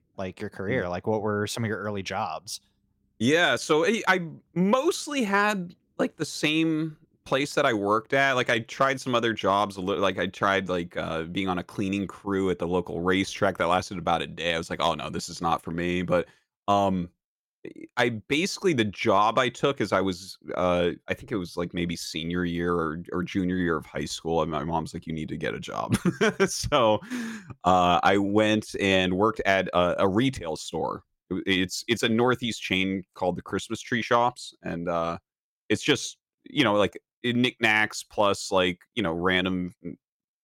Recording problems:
none

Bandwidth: 16.5 kHz